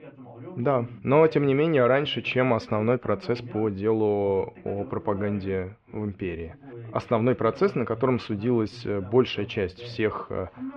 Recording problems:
muffled; very; fading above 3 kHz
voice in the background; noticeable; throughout; 20 dB below the speech

